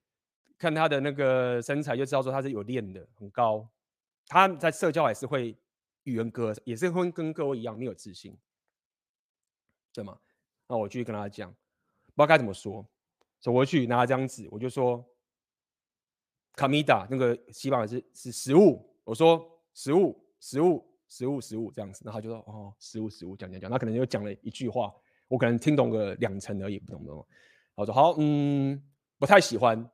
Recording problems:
none

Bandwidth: 15 kHz